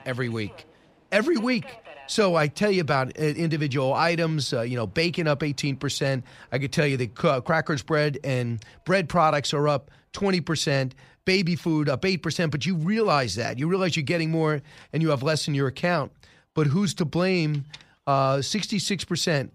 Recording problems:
train or aircraft noise; faint; throughout; 30 dB below the speech

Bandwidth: 15 kHz